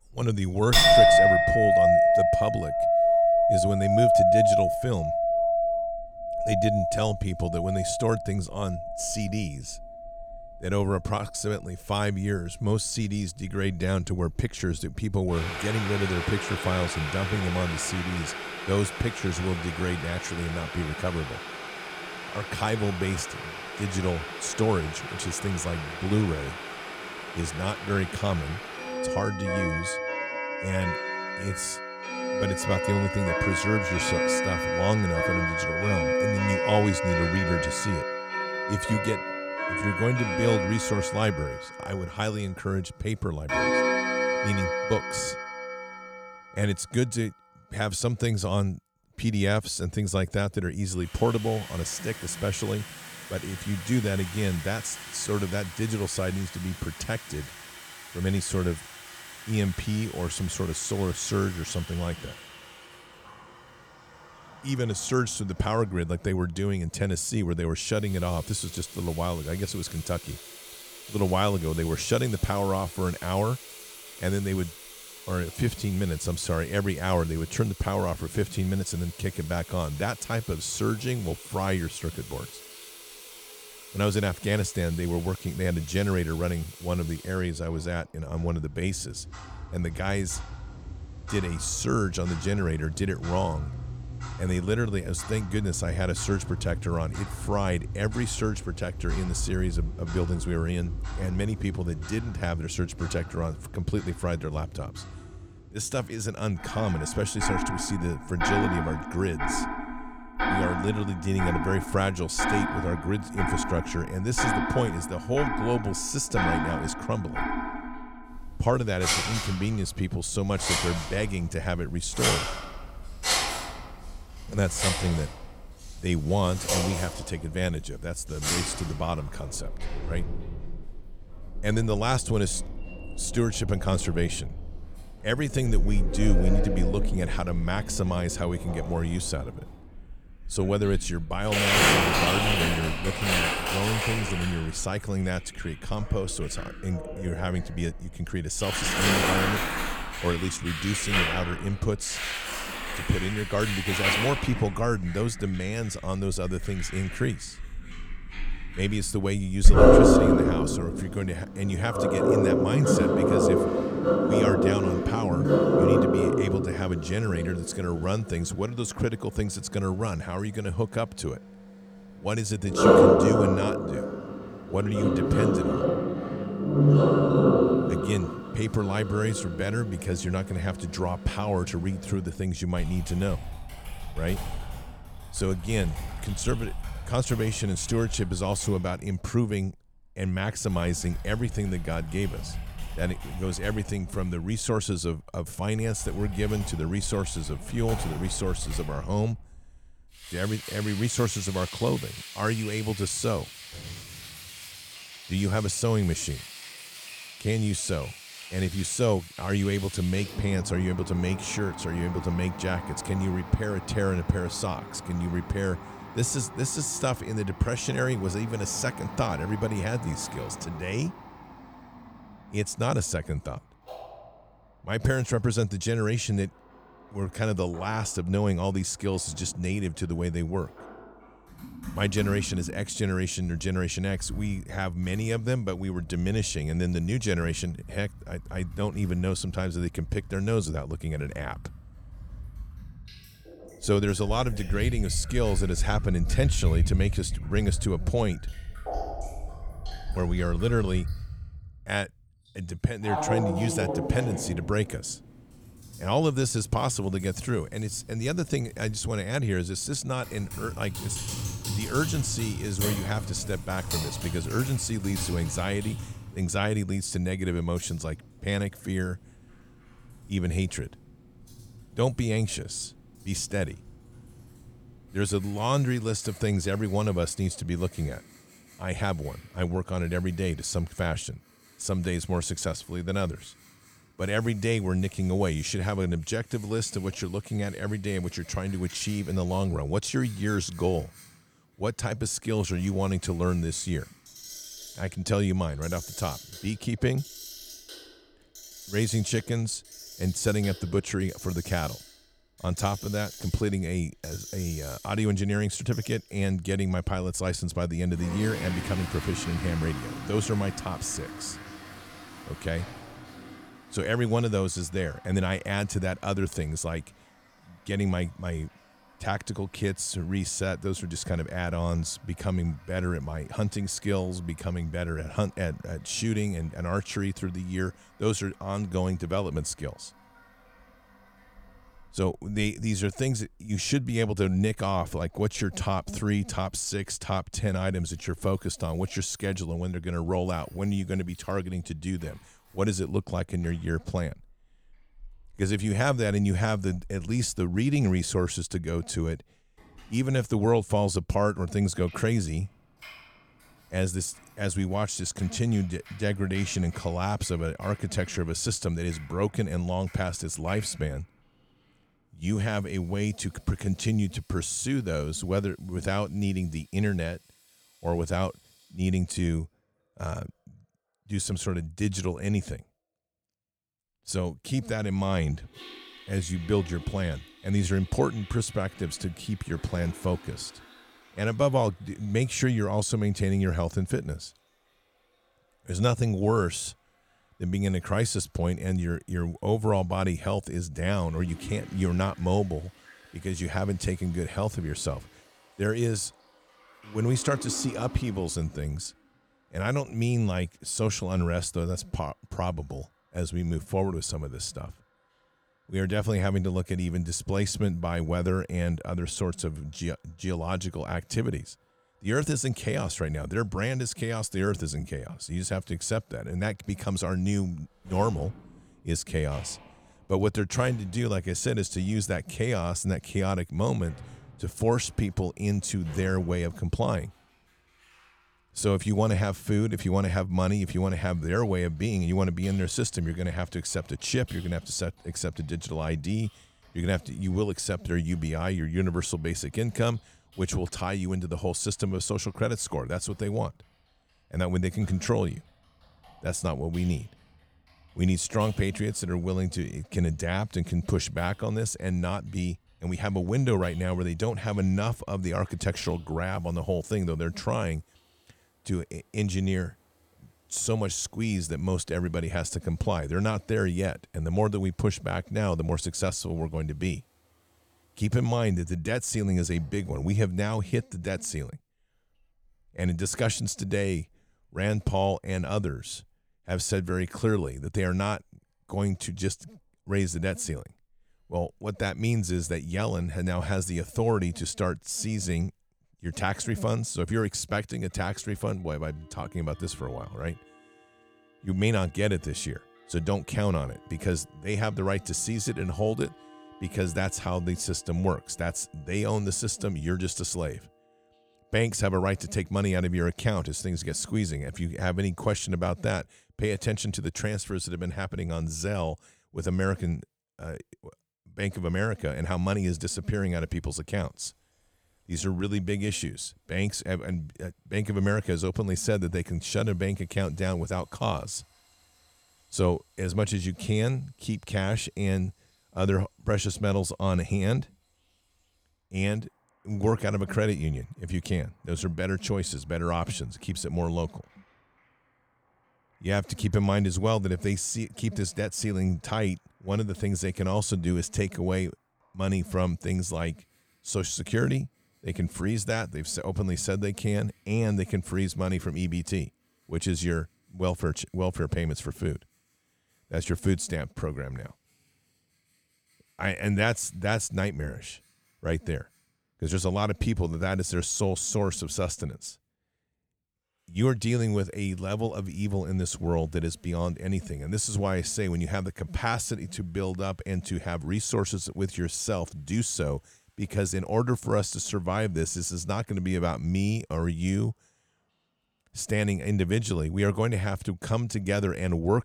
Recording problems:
household noises; loud; throughout; 1 dB below the speech

